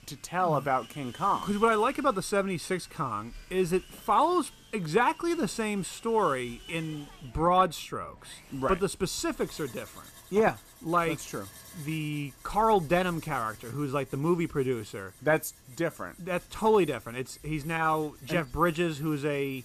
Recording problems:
machinery noise; faint; throughout; 20 dB below the speech

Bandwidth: 14.5 kHz